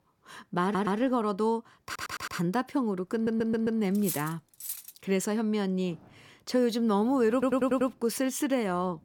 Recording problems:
household noises; faint; throughout; 30 dB below the speech
audio stuttering; 4 times, first at 0.5 s
clattering dishes; noticeable; at 4 s; peak 6 dB below the speech

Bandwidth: 18 kHz